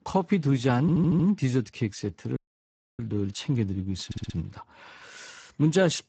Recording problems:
garbled, watery; badly; nothing above 8 kHz
audio stuttering; at 1 s and at 4 s
audio cutting out; at 2.5 s for 0.5 s

